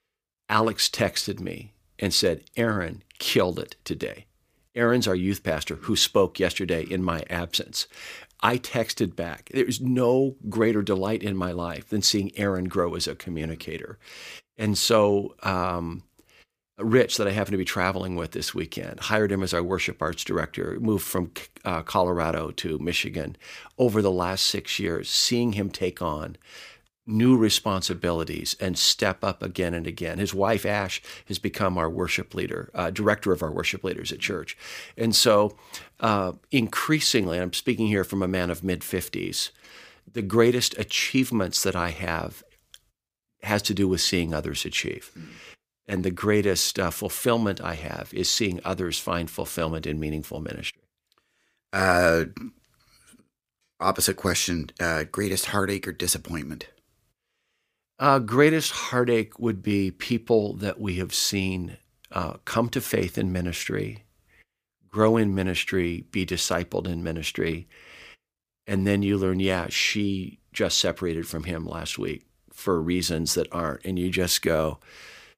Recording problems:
none

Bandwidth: 15 kHz